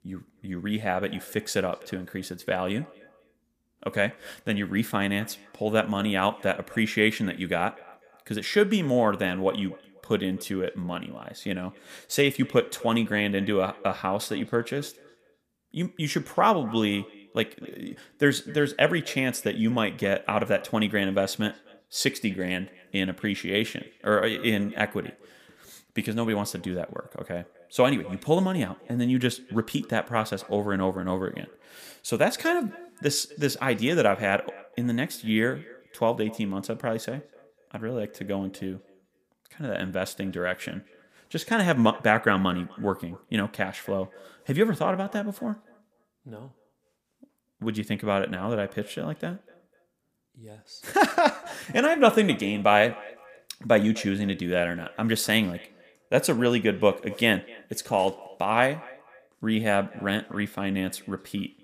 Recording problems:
echo of what is said; faint; throughout; 250 ms later, 25 dB below the speech

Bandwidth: 15 kHz